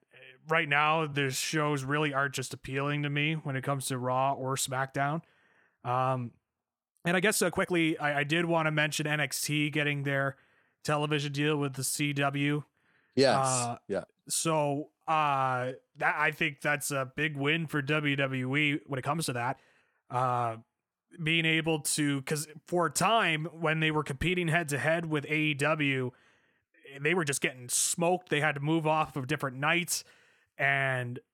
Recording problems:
uneven, jittery; strongly; from 0.5 to 29 s

